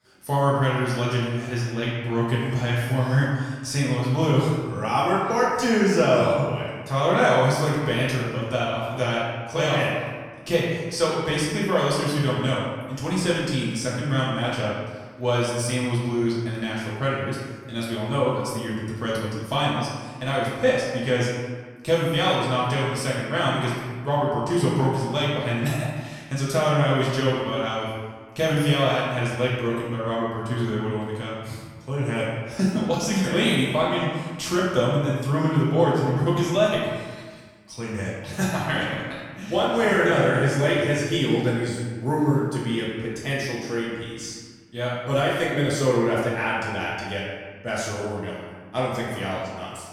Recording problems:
off-mic speech; far
room echo; noticeable; dies away in 1.3 s

